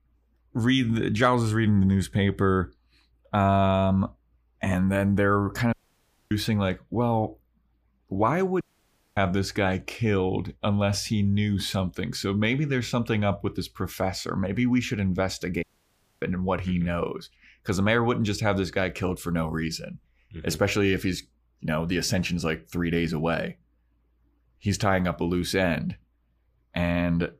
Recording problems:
audio cutting out; at 5.5 s for 0.5 s, at 8.5 s for 0.5 s and at 16 s for 0.5 s

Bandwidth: 15 kHz